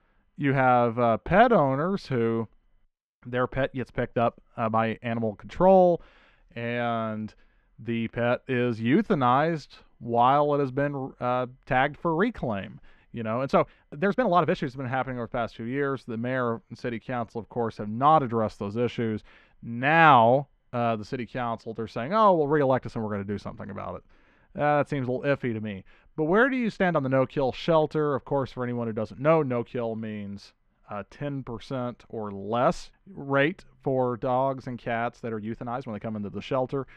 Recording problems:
muffled; slightly; fading above 2.5 kHz
uneven, jittery; strongly; from 1 to 36 s

